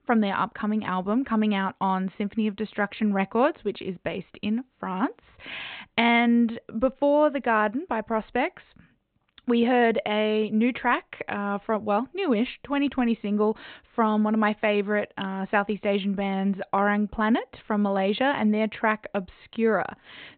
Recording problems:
high frequencies cut off; severe; nothing above 4 kHz

